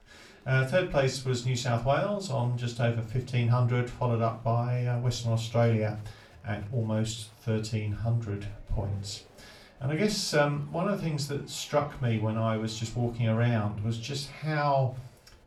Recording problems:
off-mic speech; far
room echo; very slight; dies away in 0.3 s
chatter from many people; faint; throughout; 30 dB below the speech

